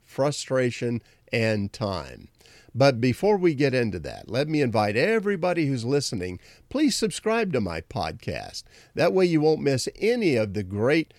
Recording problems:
none

